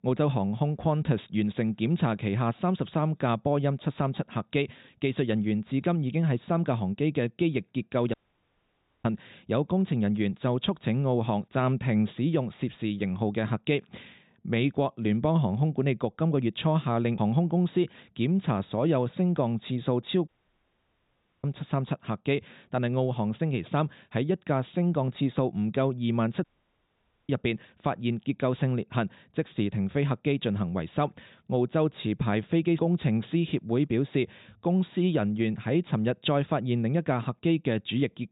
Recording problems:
high frequencies cut off; severe; nothing above 4 kHz
audio cutting out; at 8 s for 1 s, at 20 s for 1 s and at 26 s for 1 s

